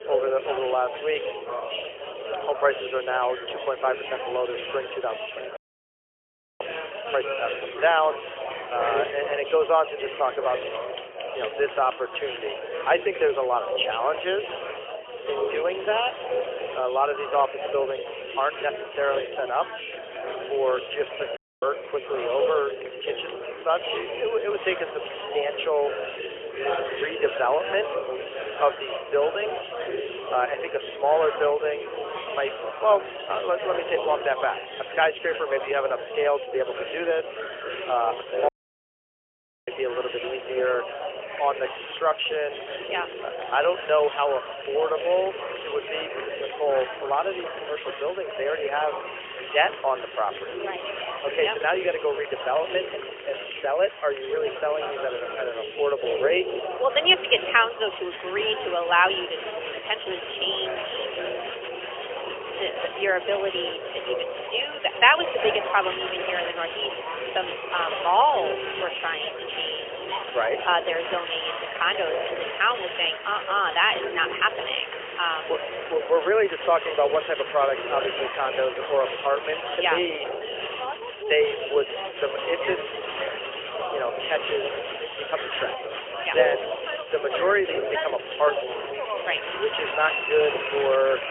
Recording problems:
phone-call audio; poor line; nothing above 3 kHz
thin; very; fading below 300 Hz
chatter from many people; loud; throughout; 6 dB below the speech
audio cutting out; at 5.5 s for 1 s, at 21 s and at 38 s for 1 s

